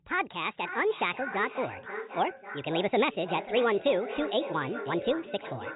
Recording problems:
echo of what is said; strong; throughout; 540 ms later, 10 dB below the speech
high frequencies cut off; severe; nothing above 4 kHz
wrong speed and pitch; too fast and too high; 1.5 times normal speed

